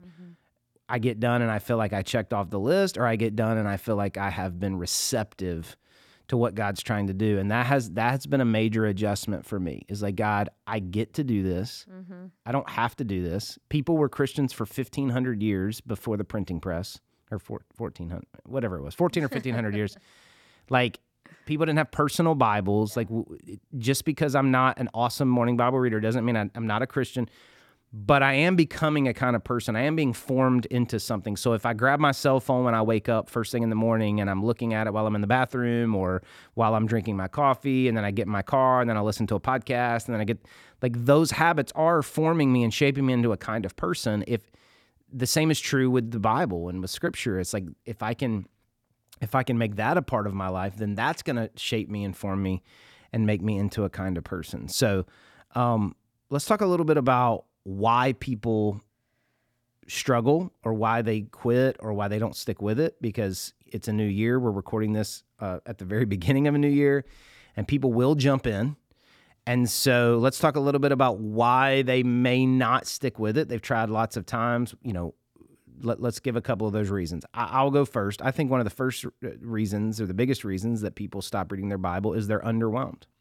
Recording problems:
none

